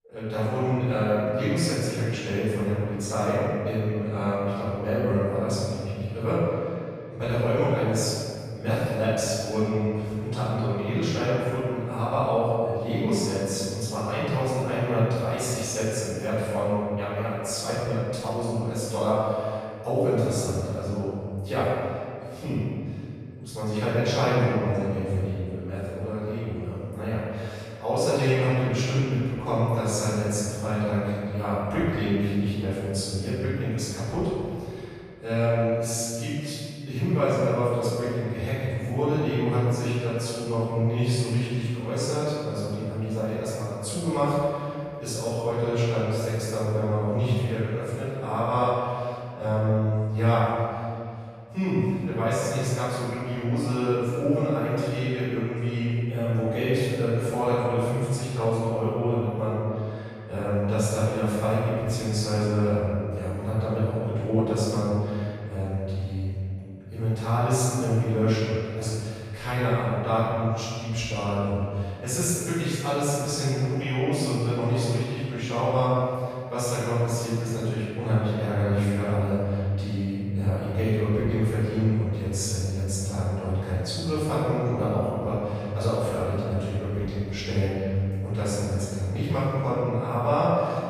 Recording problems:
room echo; strong; dies away in 2.1 s
off-mic speech; far

